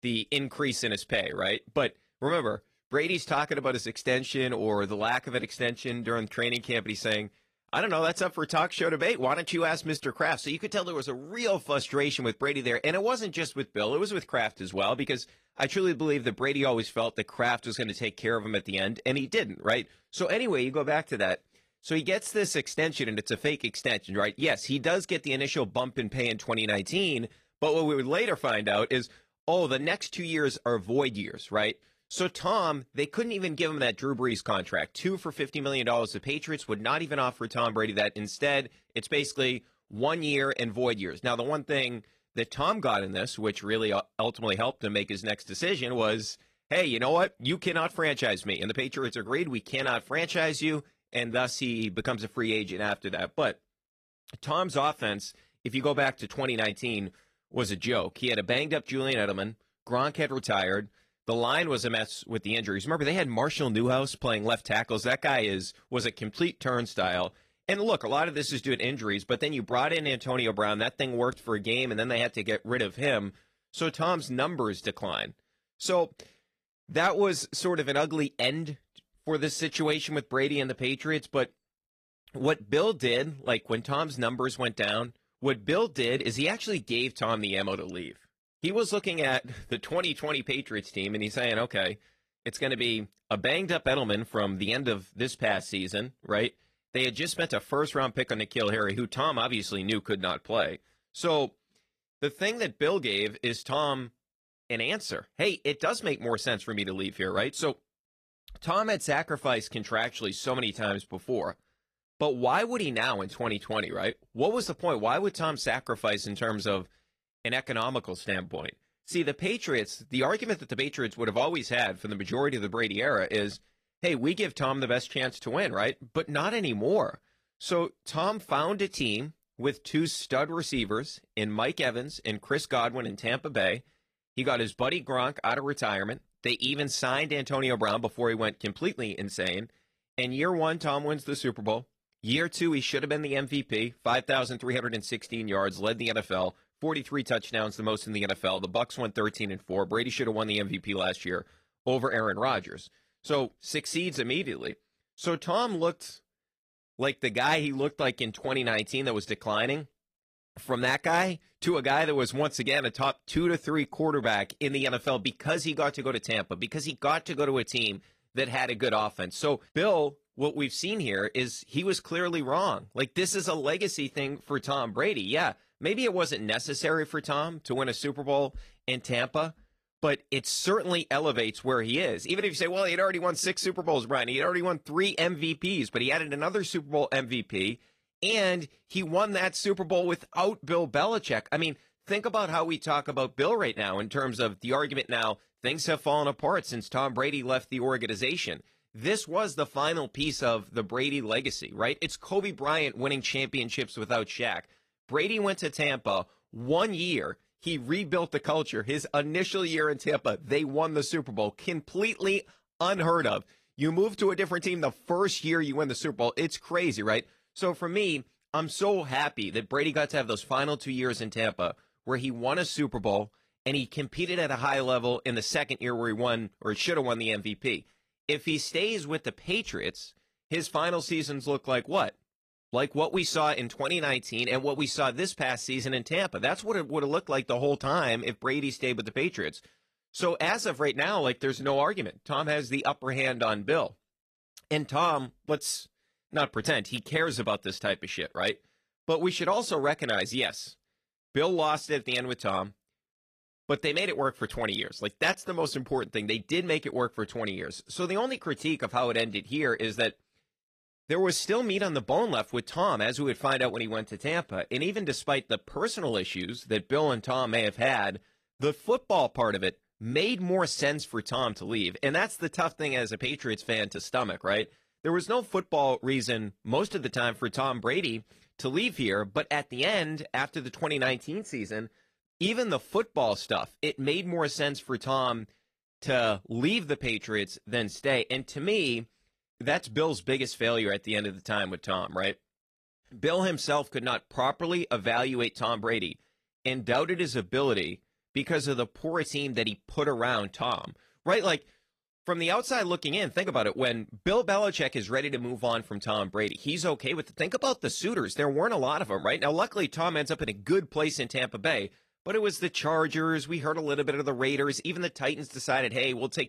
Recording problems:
garbled, watery; slightly; nothing above 15 kHz

